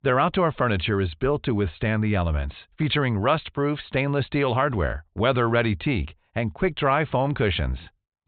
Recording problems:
high frequencies cut off; severe; nothing above 4 kHz

